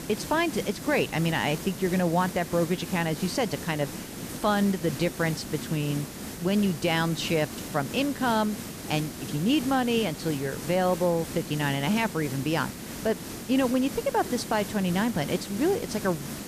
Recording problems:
hiss; loud; throughout; 9 dB below the speech

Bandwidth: 14.5 kHz